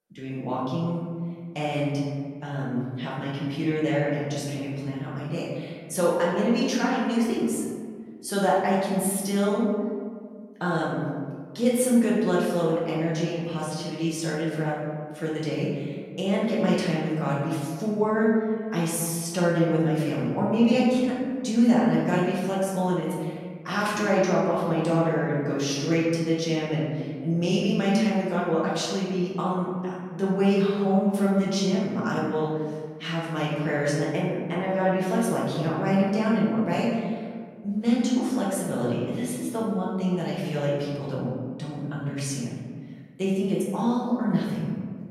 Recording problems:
off-mic speech; far
room echo; noticeable; dies away in 1.6 s

